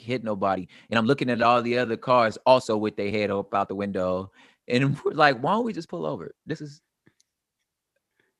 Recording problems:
uneven, jittery; strongly; from 0.5 to 6.5 s

